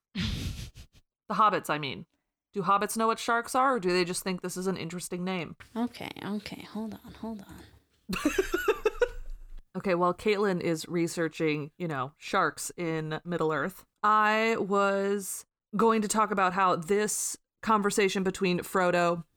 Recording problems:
none

